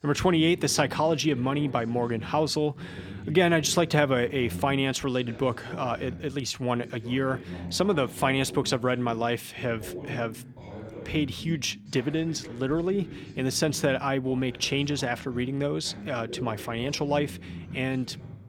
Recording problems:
voice in the background; noticeable; throughout; 15 dB below the speech

